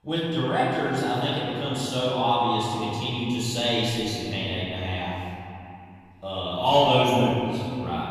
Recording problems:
room echo; strong; dies away in 2.6 s
off-mic speech; far

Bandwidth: 14.5 kHz